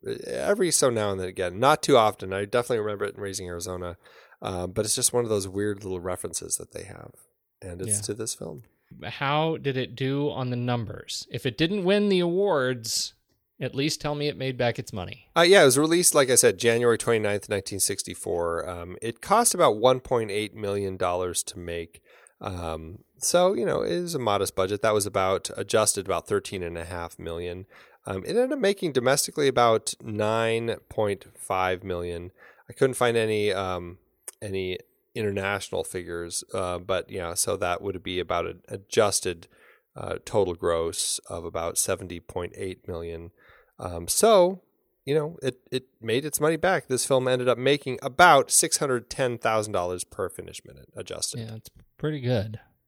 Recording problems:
none

